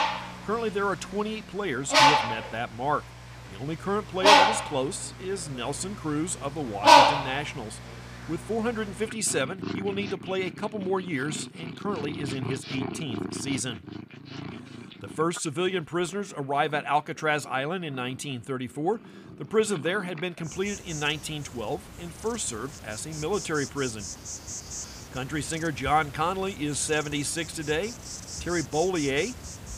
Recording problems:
animal sounds; very loud; throughout; 4 dB above the speech

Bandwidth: 15 kHz